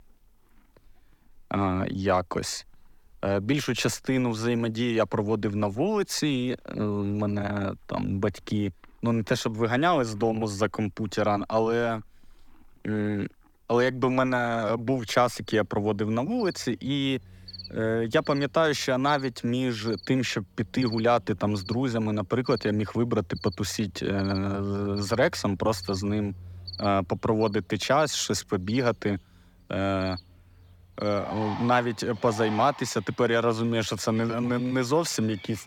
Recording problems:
animal sounds; noticeable; throughout; 15 dB below the speech

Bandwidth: 18 kHz